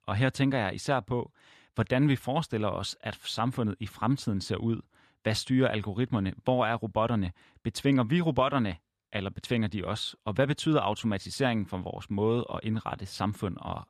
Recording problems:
none

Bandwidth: 14 kHz